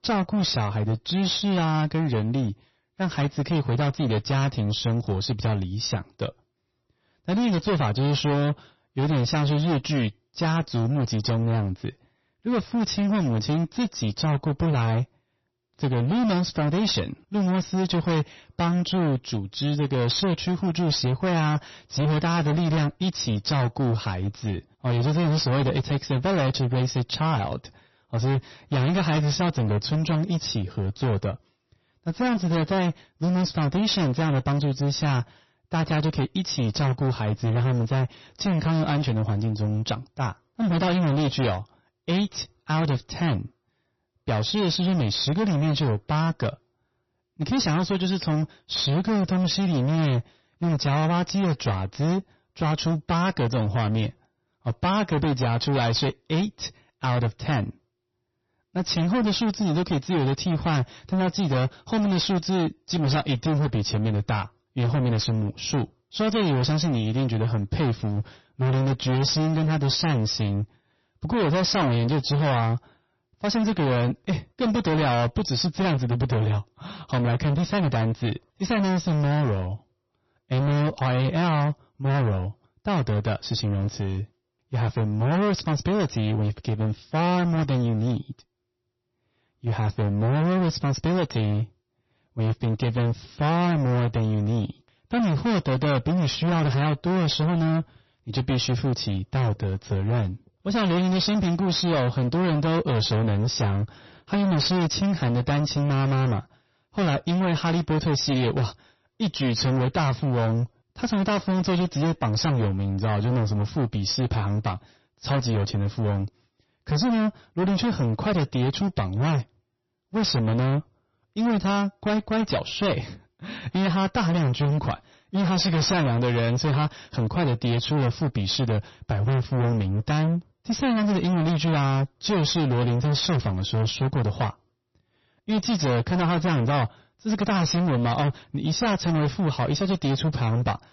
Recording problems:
distortion; heavy; 28% of the sound clipped
garbled, watery; slightly; nothing above 6 kHz

